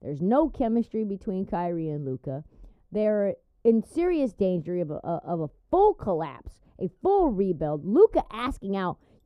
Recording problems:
muffled; very; fading above 1 kHz

